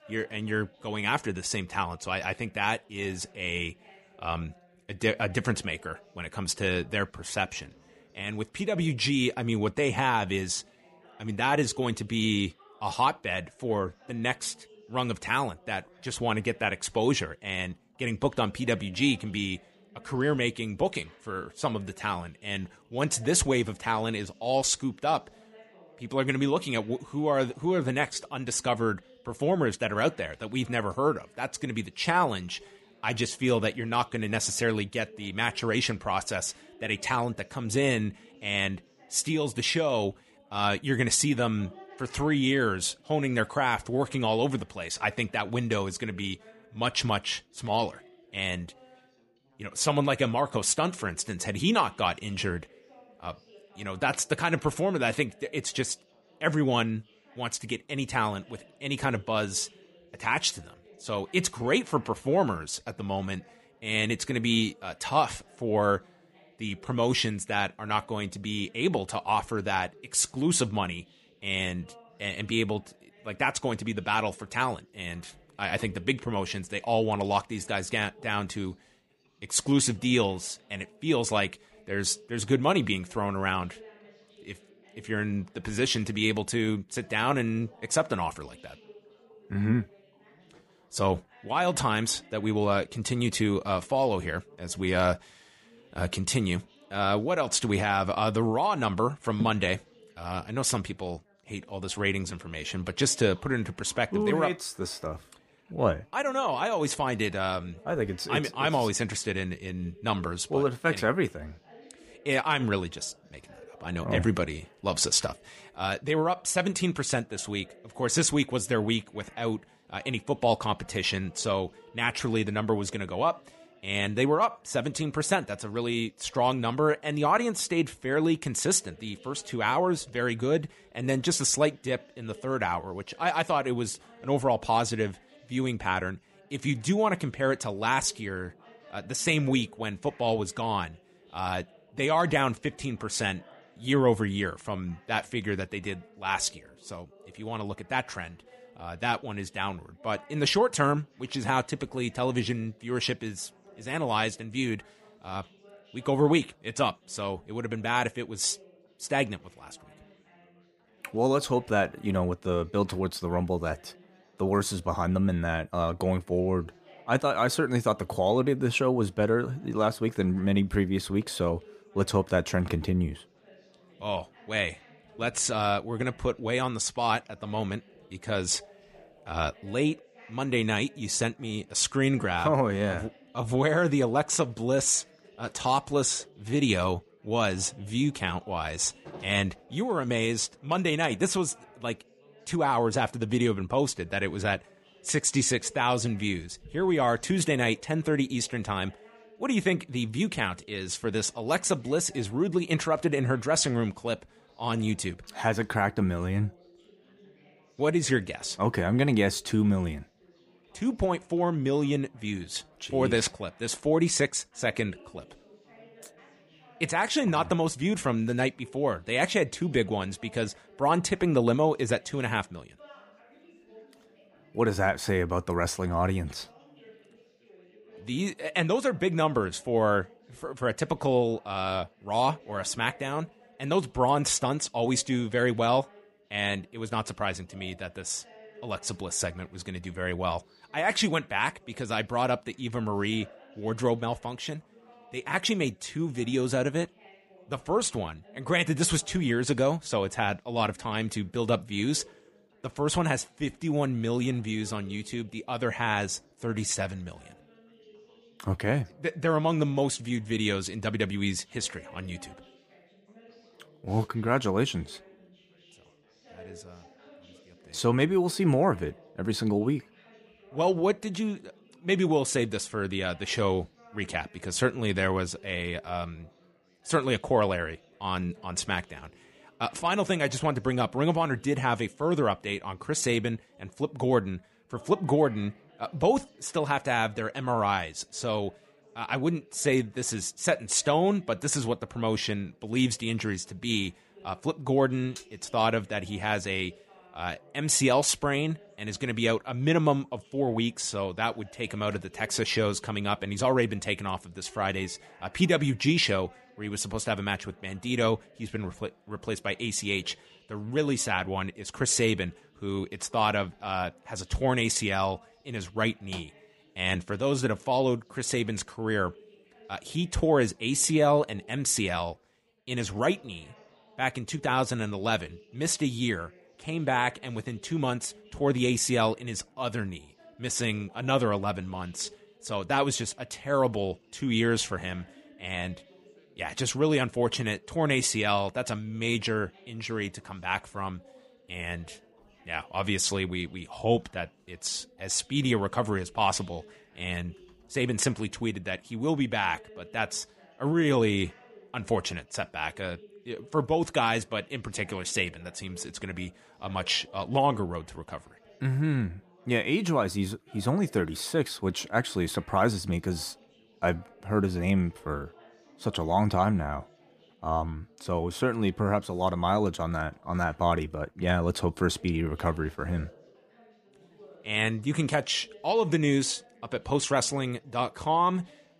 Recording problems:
background chatter; faint; throughout; 4 voices, 30 dB below the speech

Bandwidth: 15 kHz